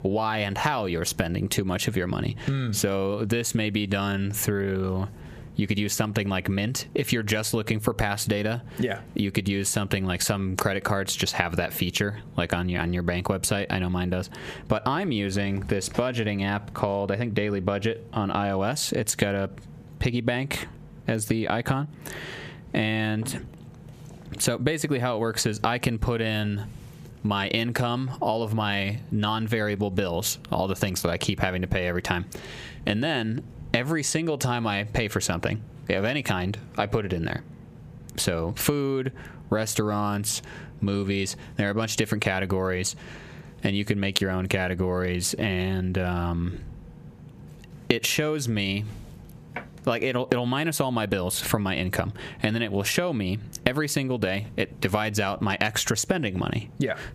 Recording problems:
squashed, flat; heavily

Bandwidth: 14.5 kHz